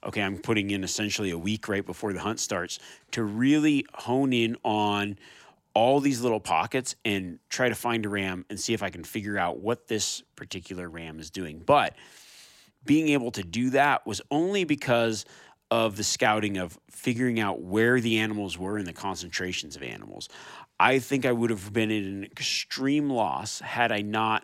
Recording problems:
none

